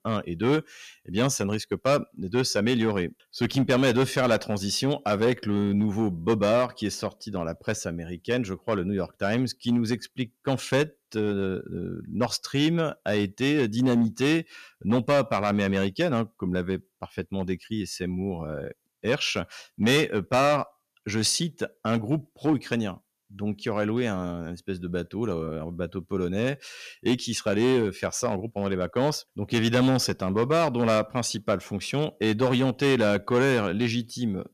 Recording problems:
distortion; slight; 4% of the sound clipped

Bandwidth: 14.5 kHz